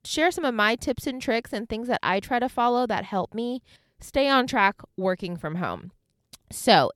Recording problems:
none

